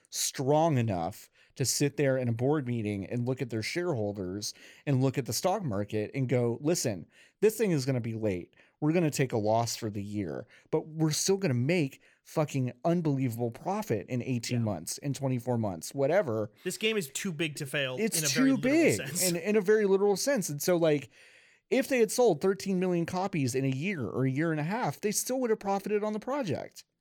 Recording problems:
none

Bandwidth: 18.5 kHz